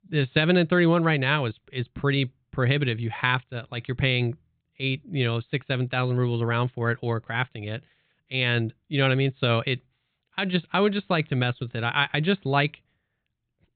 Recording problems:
high frequencies cut off; severe; nothing above 4 kHz

